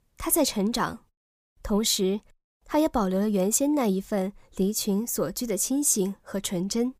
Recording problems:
none

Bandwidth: 15 kHz